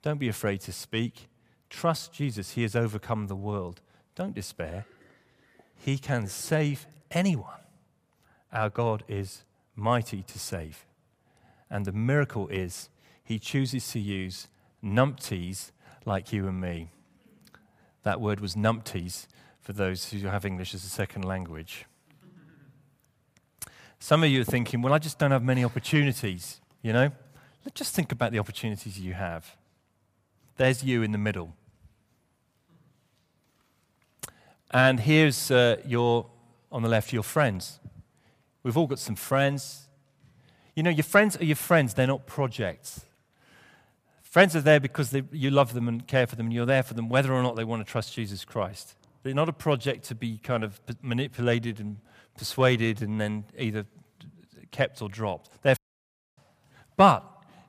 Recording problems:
audio cutting out; at 56 s for 0.5 s

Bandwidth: 15 kHz